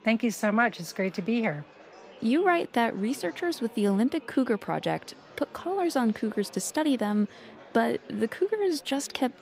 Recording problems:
murmuring crowd; faint; throughout; 20 dB below the speech

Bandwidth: 15.5 kHz